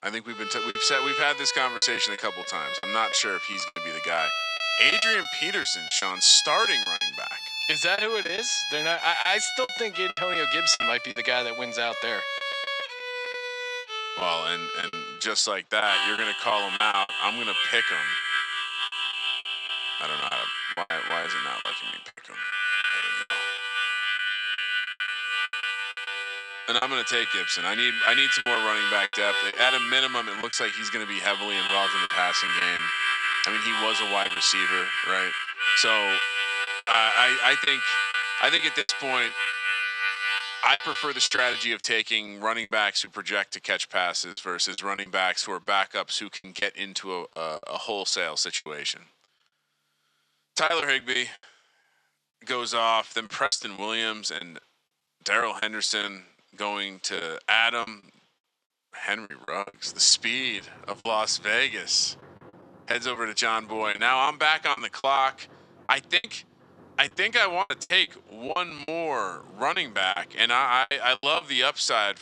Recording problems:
thin; very; fading below 750 Hz
background music; loud; throughout; 1 dB below the speech
choppy; very; 9% of the speech affected

